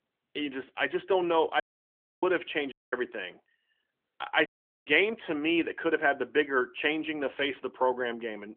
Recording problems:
phone-call audio; nothing above 3.5 kHz
audio cutting out; at 1.5 s for 0.5 s, at 2.5 s and at 4.5 s

